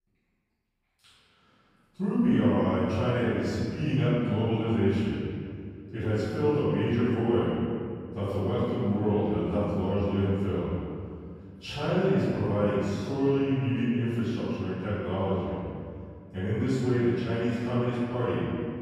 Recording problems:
room echo; strong; dies away in 2.2 s
off-mic speech; far

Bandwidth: 15 kHz